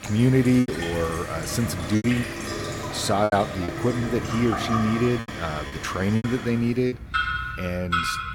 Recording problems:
household noises; loud; throughout; 6 dB below the speech
choppy; very; at 0.5 s, from 2 to 3.5 s and from 5 to 7 s; 11% of the speech affected

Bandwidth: 17.5 kHz